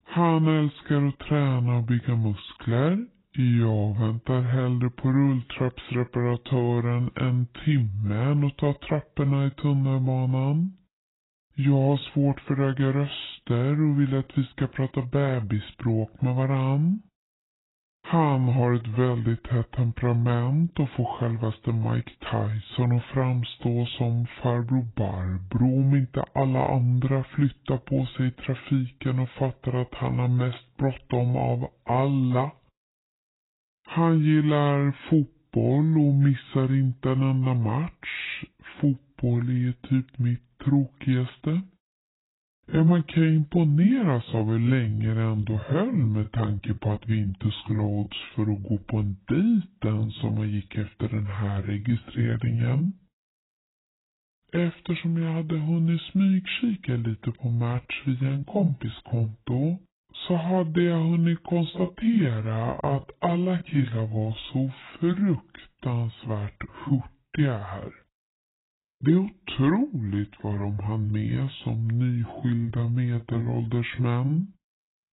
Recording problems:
garbled, watery; badly; nothing above 4 kHz
wrong speed and pitch; too slow and too low; 0.7 times normal speed

